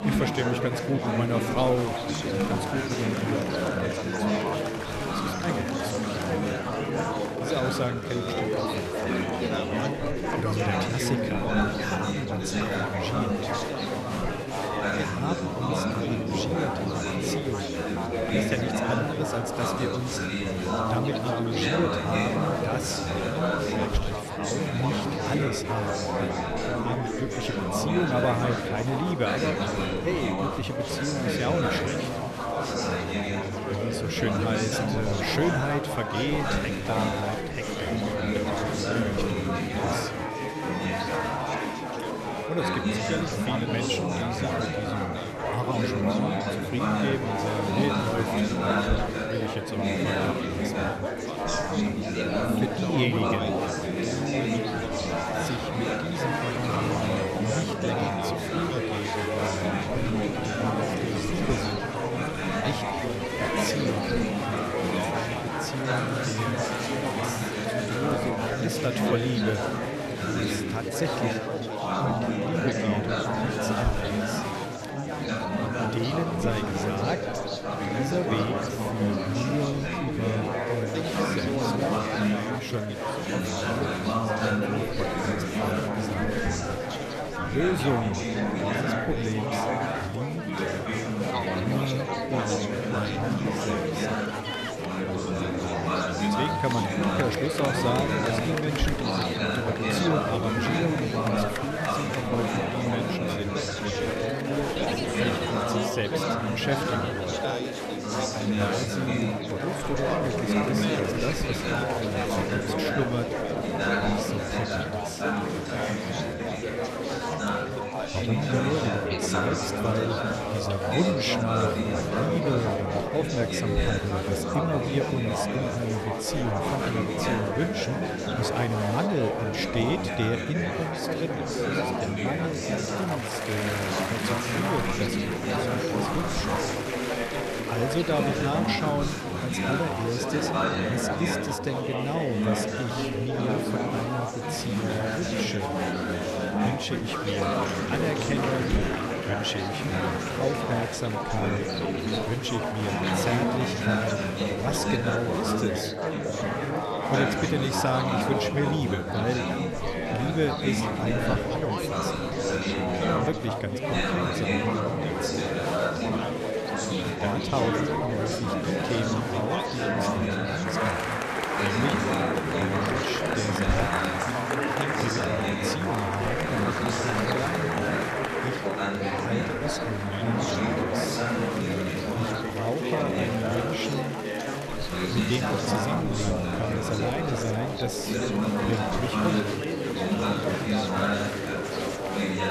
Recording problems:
chatter from many people; very loud; throughout; 4 dB above the speech

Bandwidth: 13.5 kHz